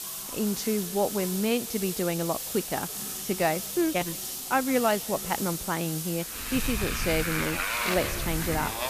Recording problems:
echo of what is said; faint; throughout; 170 ms later, 25 dB below the speech
traffic noise; loud; from 6.5 s on; 2 dB below the speech
hiss; loud; throughout; 4 dB below the speech
household noises; noticeable; until 5.5 s; 10 dB below the speech
crowd noise; faint; throughout; 30 dB below the speech

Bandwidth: 14.5 kHz